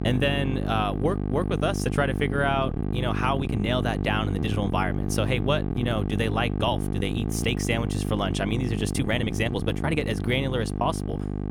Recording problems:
electrical hum; loud; throughout; 50 Hz, 8 dB below the speech
uneven, jittery; strongly; from 2.5 to 10 s

